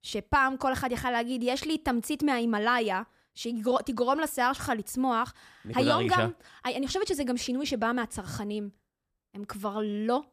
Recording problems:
none

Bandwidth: 15 kHz